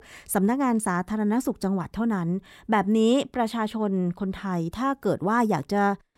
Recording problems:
none

